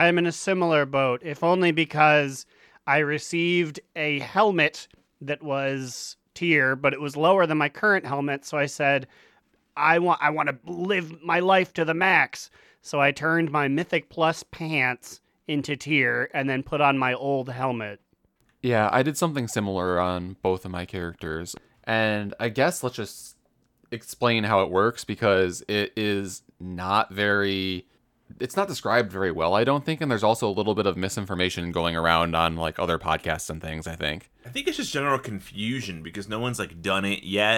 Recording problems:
abrupt cut into speech; at the start and the end

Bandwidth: 17.5 kHz